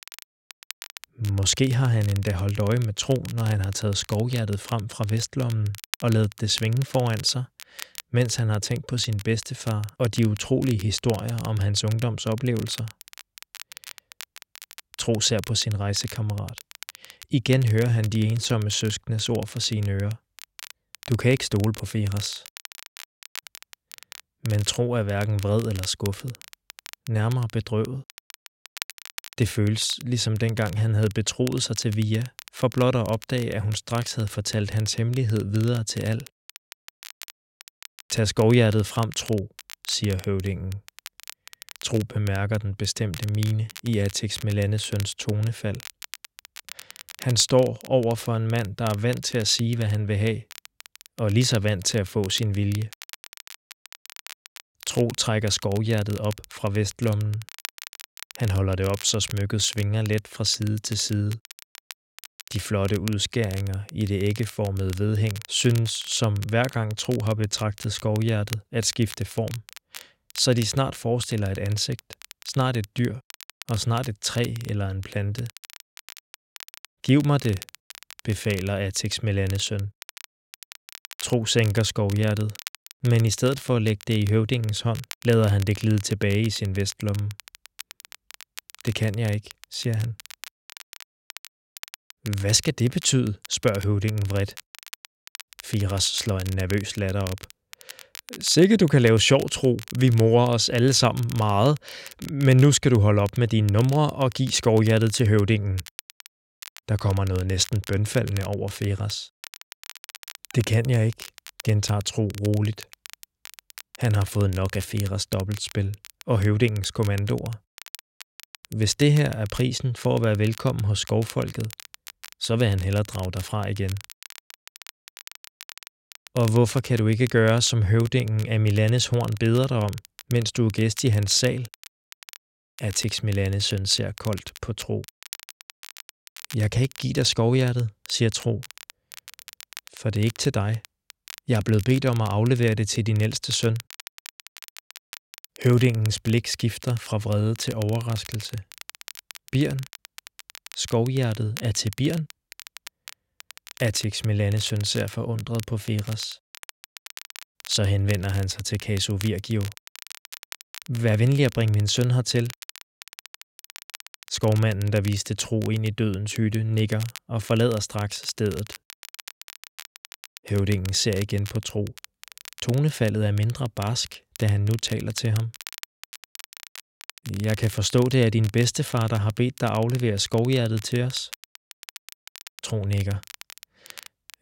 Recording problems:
crackle, like an old record; noticeable; 20 dB below the speech

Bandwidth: 16 kHz